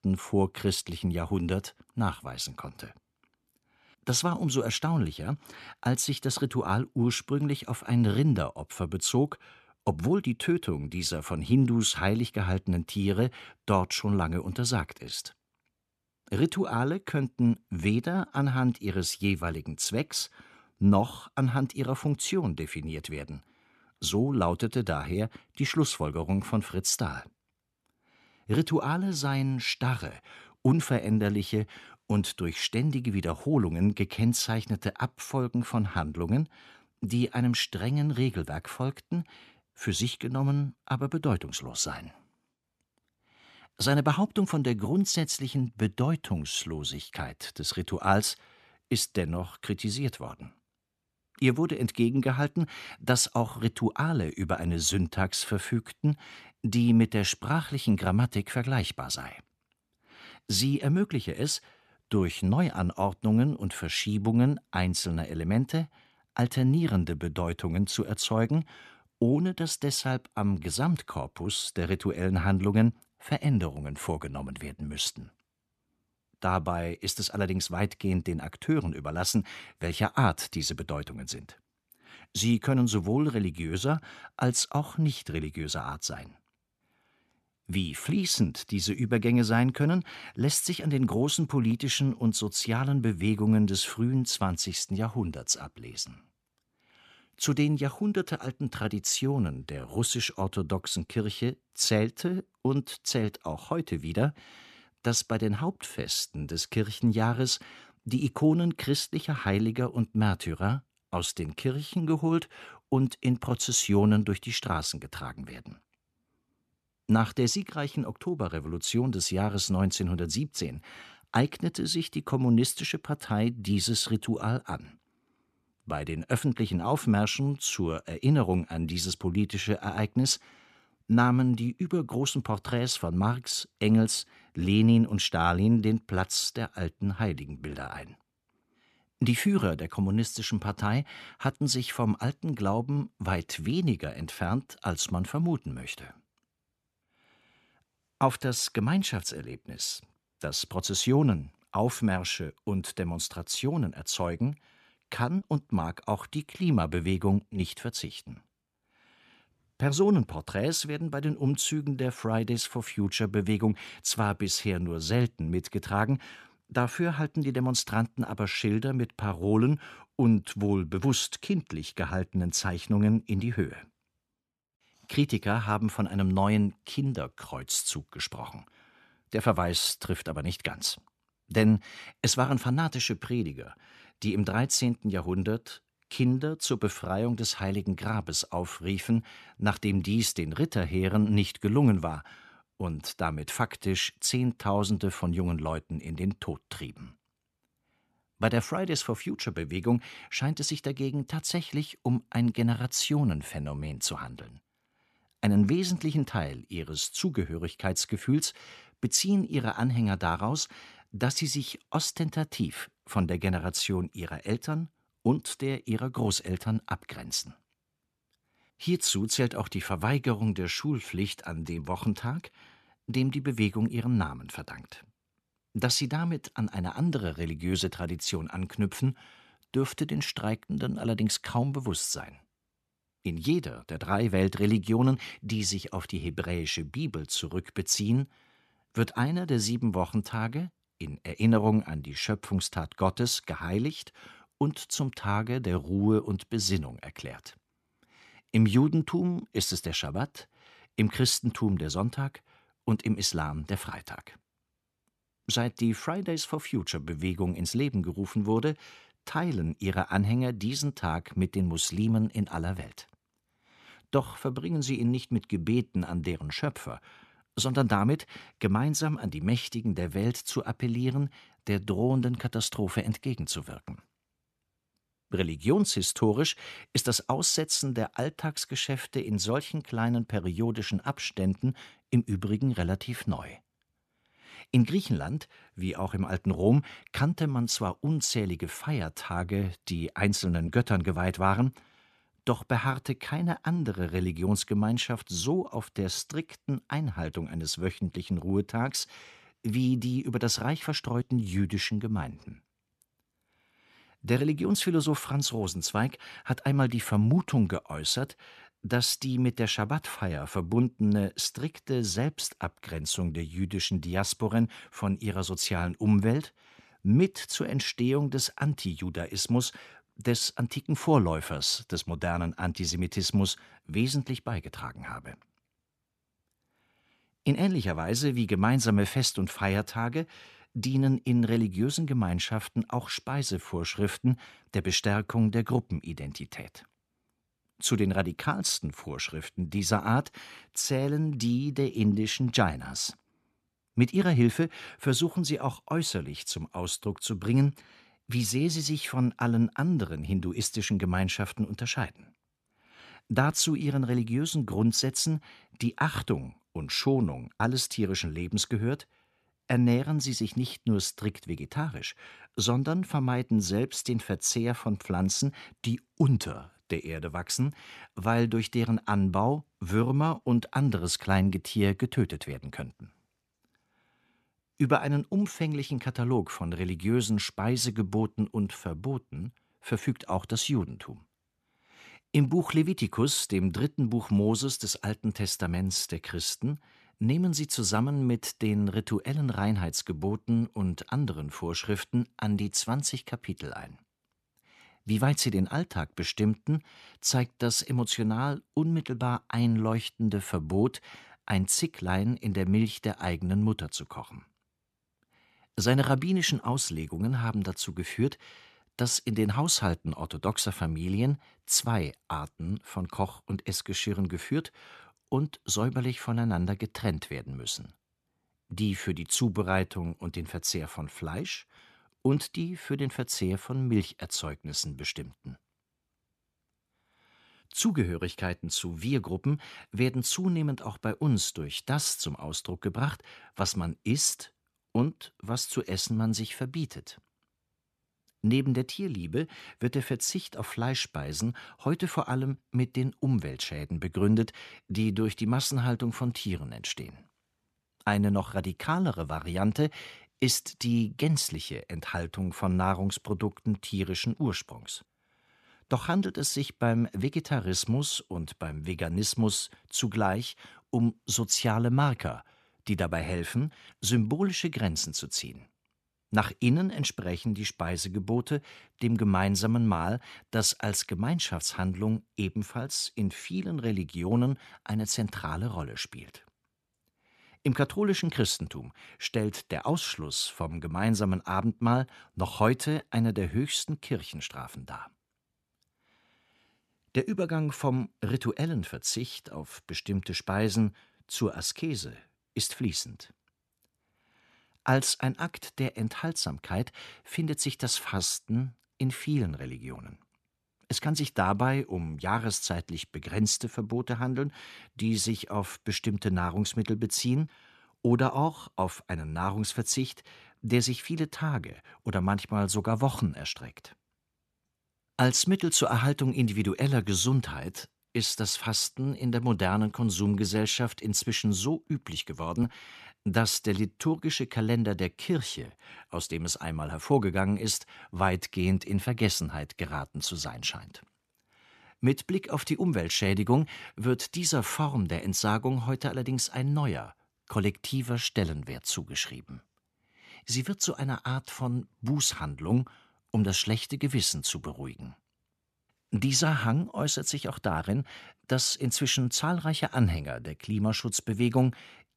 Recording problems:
none

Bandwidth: 13.5 kHz